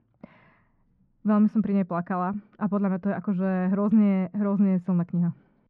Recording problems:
muffled; very; fading above 1.5 kHz

